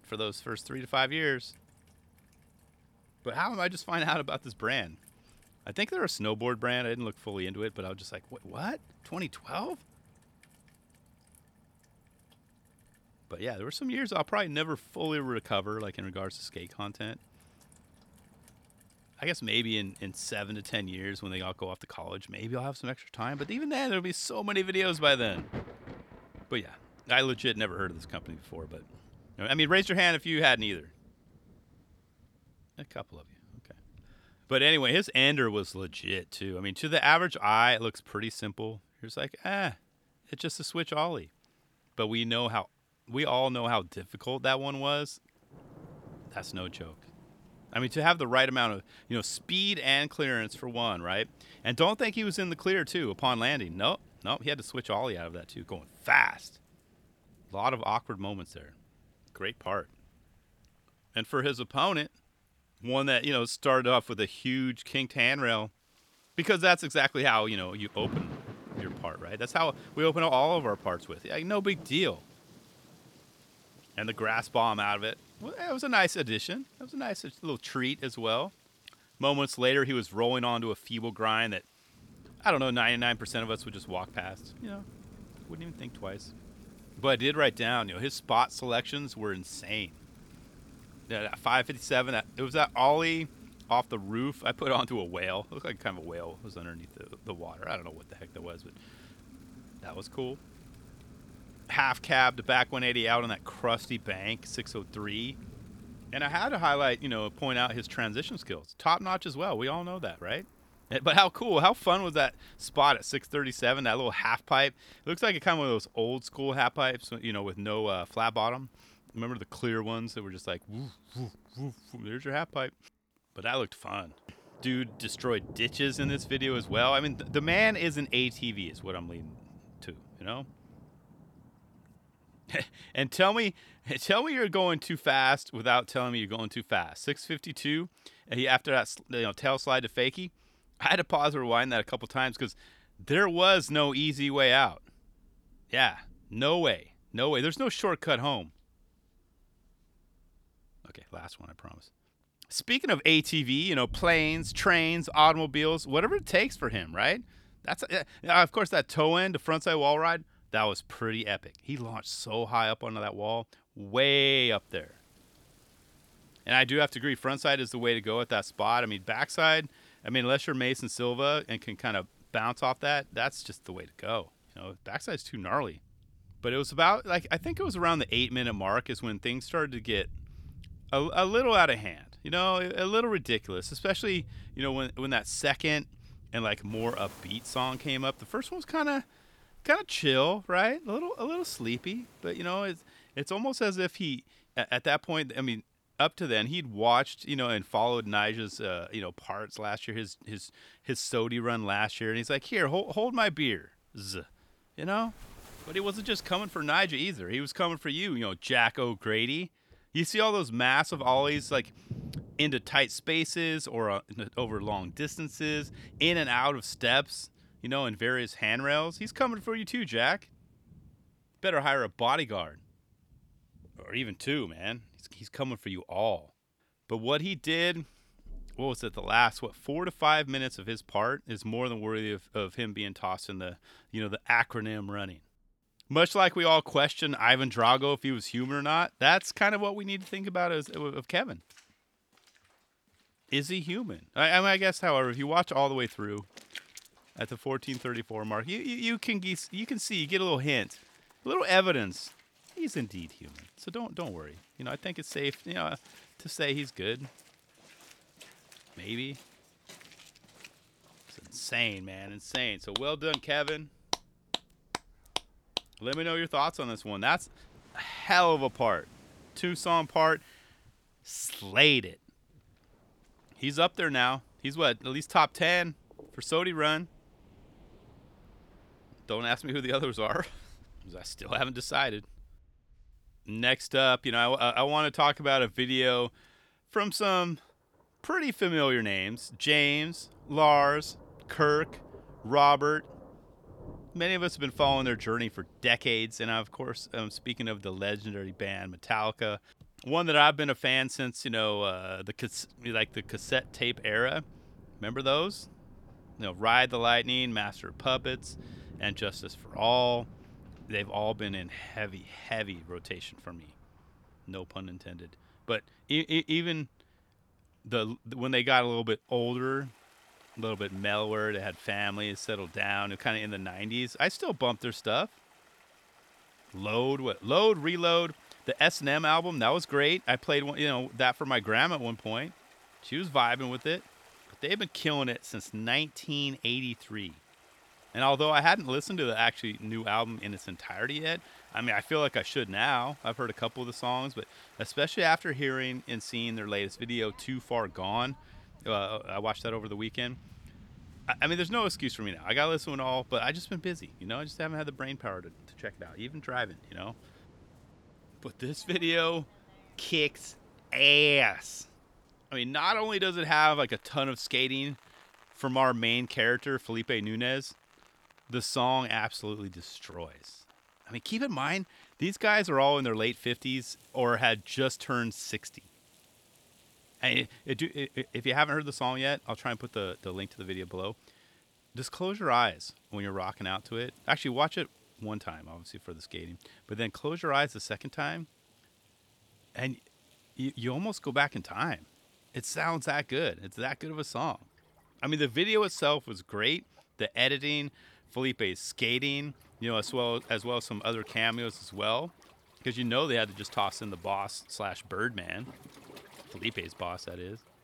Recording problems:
rain or running water; faint; throughout; 25 dB below the speech

